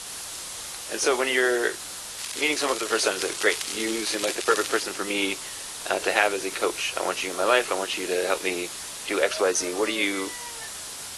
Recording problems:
thin; very; fading below 400 Hz
garbled, watery; slightly
hiss; loud; throughout; 8 dB below the speech
crackling; loud; from 2 to 5 s; 7 dB below the speech
animal sounds; noticeable; throughout; 20 dB below the speech

